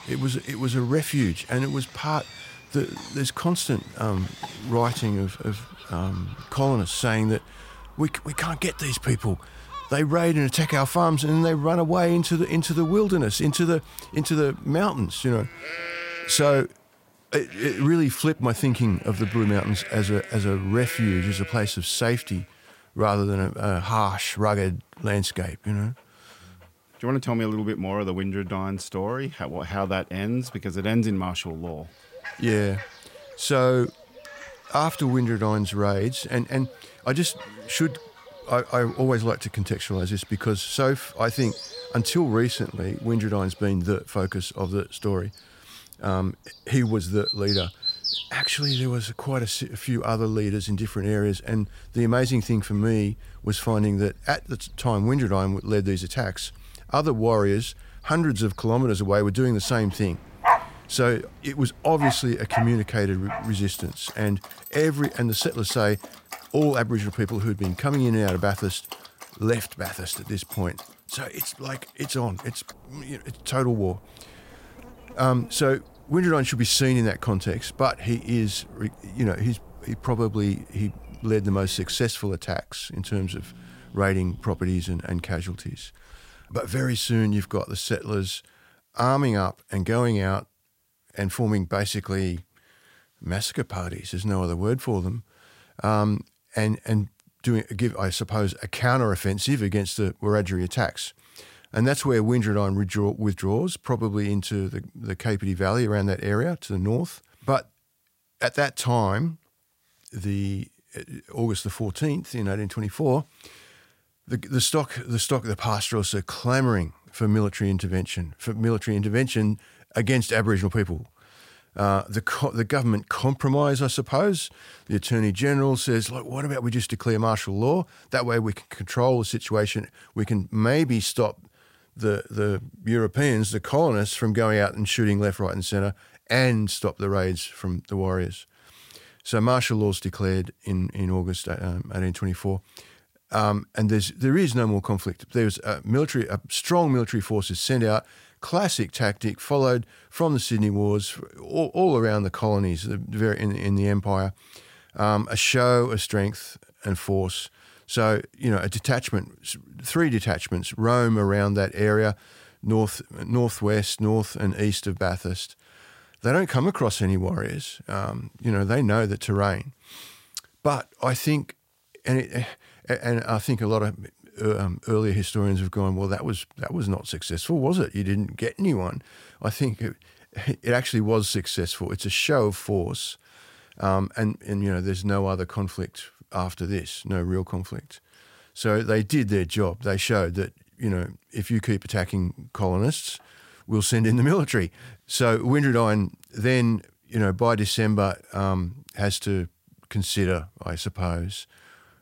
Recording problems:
animal sounds; noticeable; until 1:27; 10 dB below the speech

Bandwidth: 16 kHz